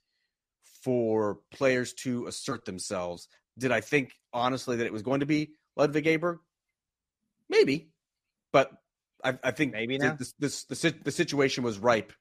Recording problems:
none

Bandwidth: 15 kHz